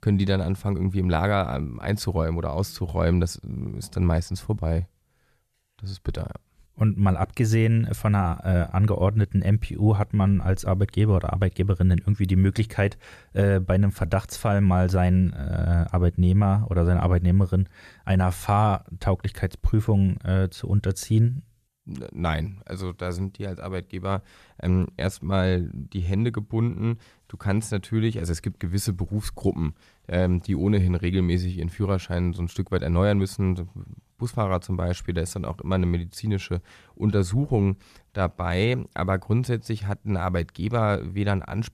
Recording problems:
none

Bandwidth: 14 kHz